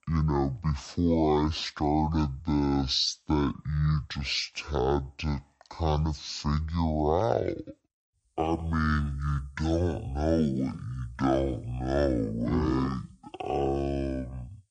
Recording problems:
wrong speed and pitch; too slow and too low; 0.5 times normal speed

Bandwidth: 9.5 kHz